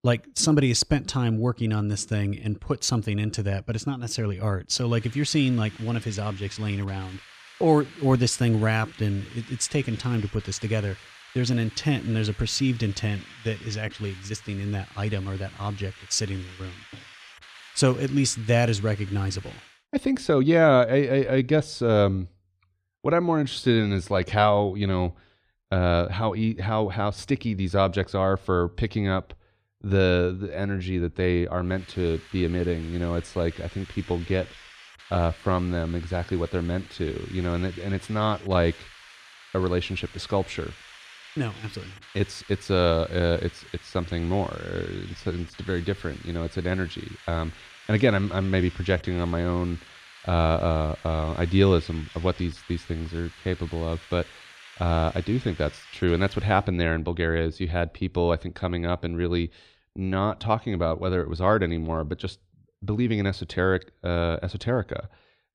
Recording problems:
hiss; noticeable; from 5 to 20 s and from 32 to 57 s; 20 dB below the speech

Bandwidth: 14 kHz